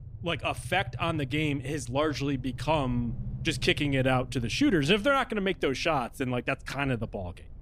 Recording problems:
low rumble; faint; throughout; 25 dB below the speech

